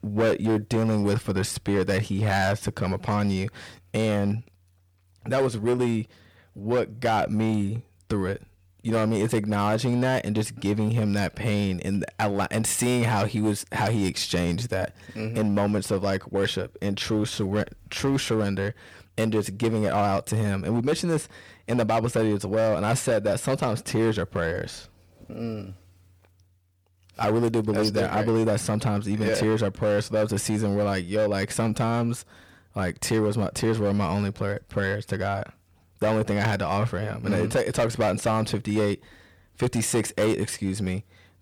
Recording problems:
distortion; slight; 9% of the sound clipped

